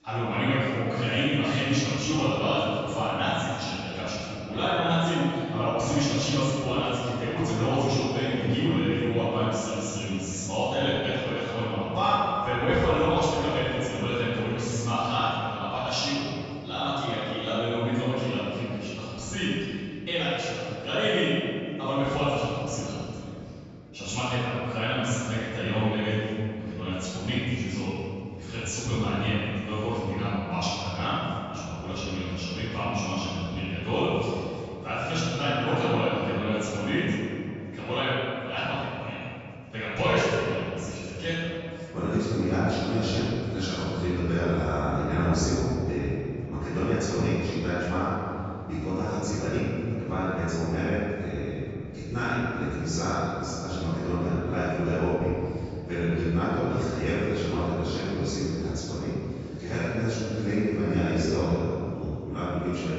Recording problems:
room echo; strong; dies away in 2.6 s
off-mic speech; far
high frequencies cut off; noticeable; nothing above 8 kHz
chatter from many people; faint; throughout; 30 dB below the speech

